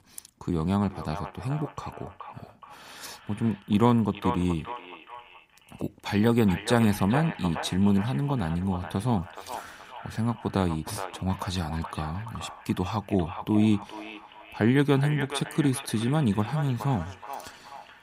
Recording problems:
echo of what is said; noticeable; throughout; 420 ms later, 15 dB below the speech

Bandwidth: 15.5 kHz